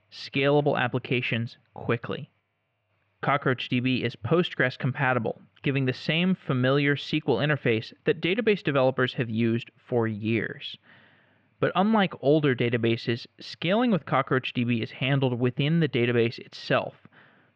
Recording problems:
muffled; very; fading above 3 kHz

